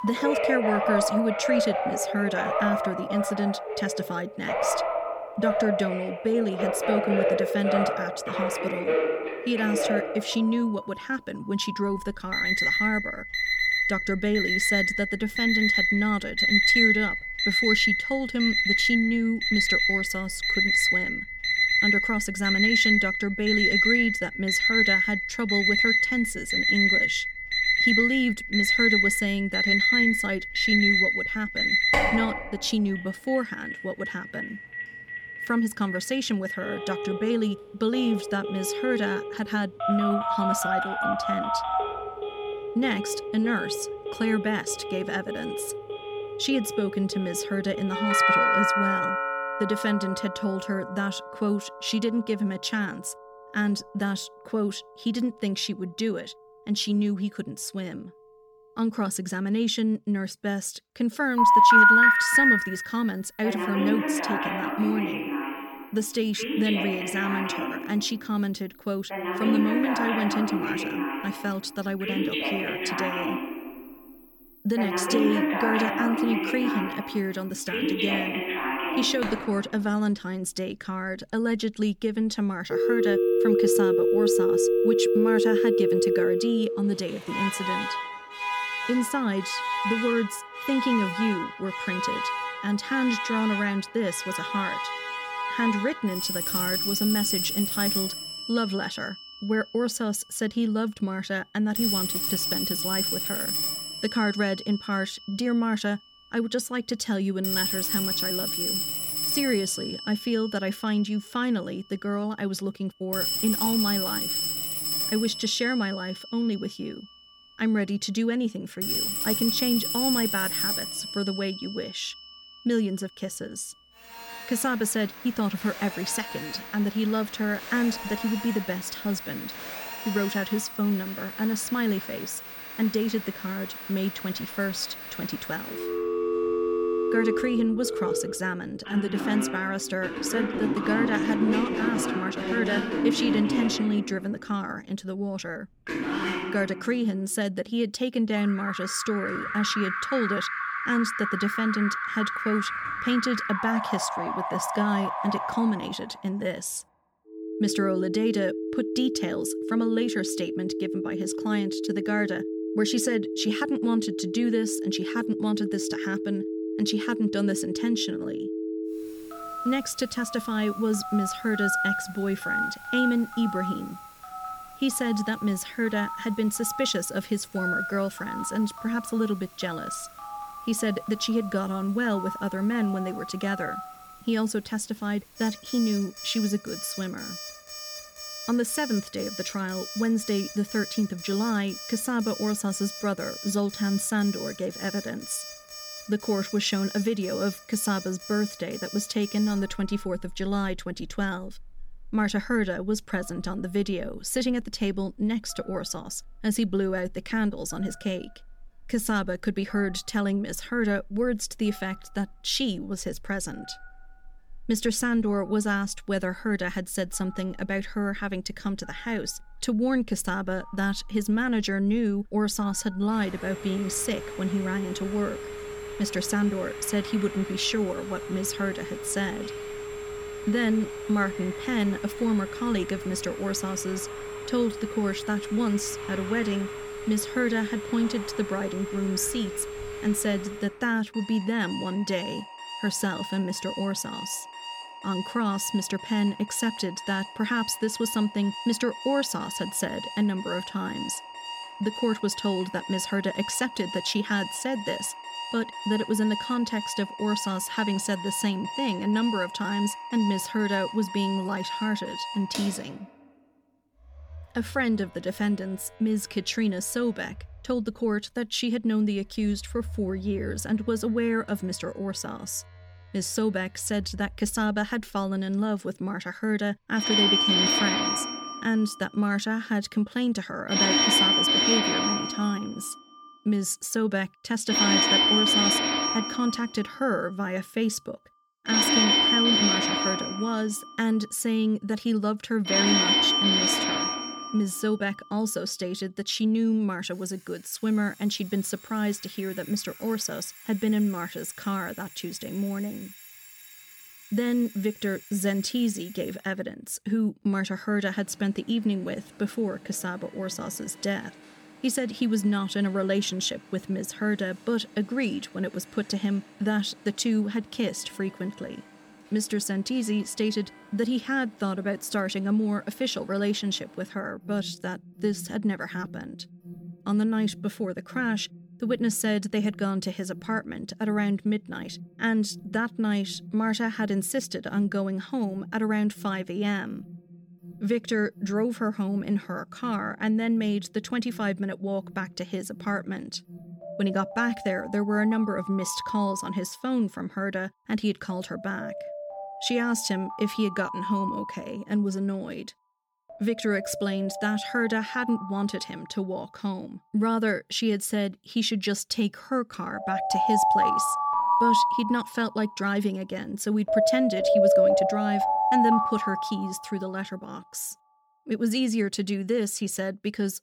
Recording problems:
alarms or sirens; very loud; throughout; 1 dB above the speech

